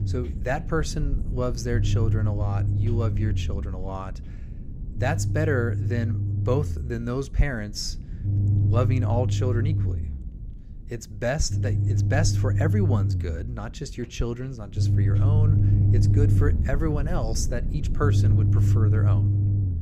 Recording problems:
low rumble; loud; throughout; 6 dB below the speech

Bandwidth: 15.5 kHz